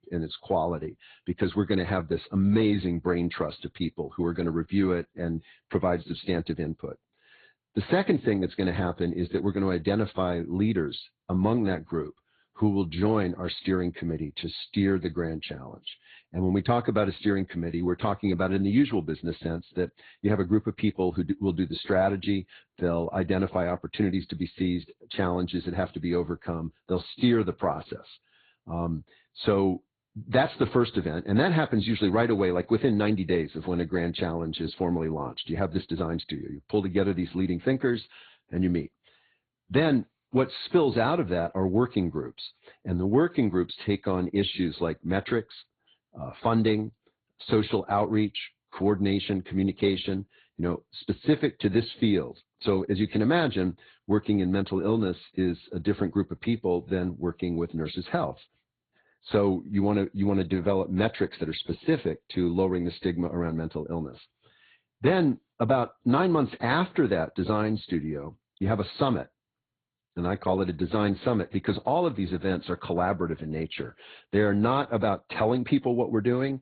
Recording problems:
high frequencies cut off; severe; nothing above 4 kHz
garbled, watery; slightly

